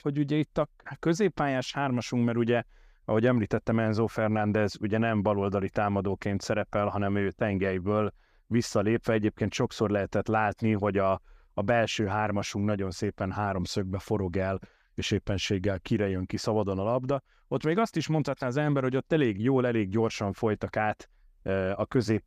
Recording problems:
none

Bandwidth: 15 kHz